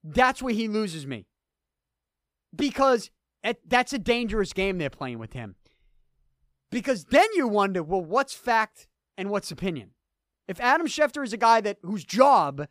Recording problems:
none

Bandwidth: 15 kHz